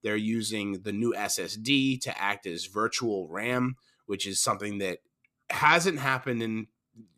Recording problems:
none

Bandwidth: 14.5 kHz